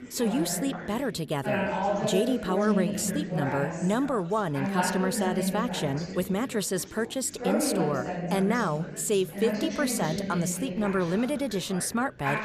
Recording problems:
chatter from many people; loud; throughout; 3 dB below the speech

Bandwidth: 14.5 kHz